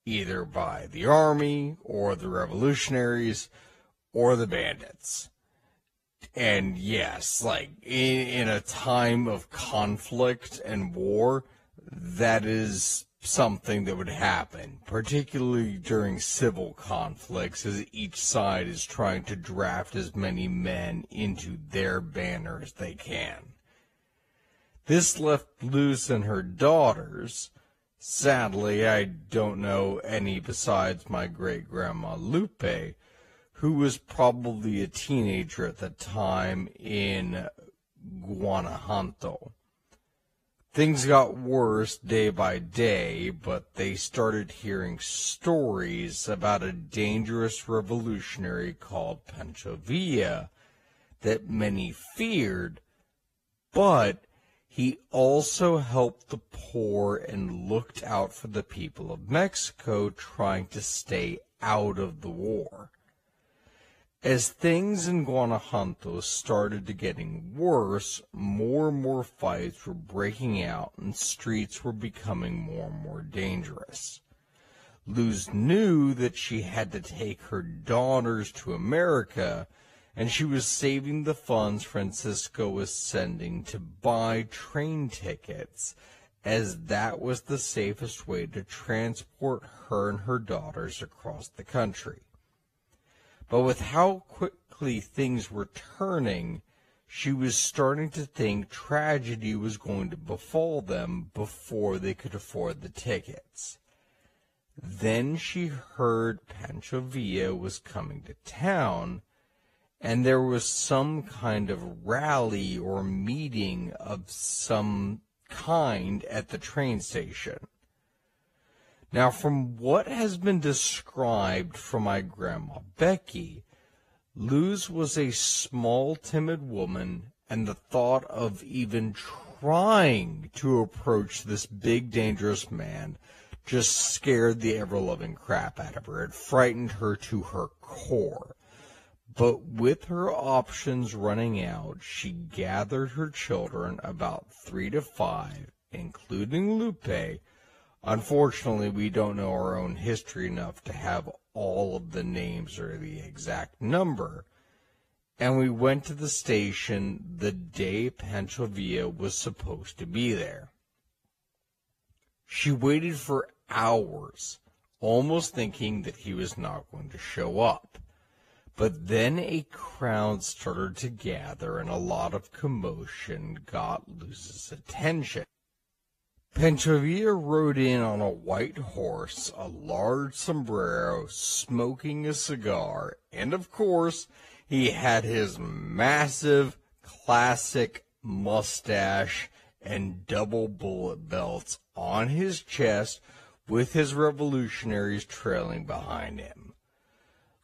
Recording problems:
wrong speed, natural pitch; too slow; 0.6 times normal speed
garbled, watery; slightly; nothing above 14.5 kHz

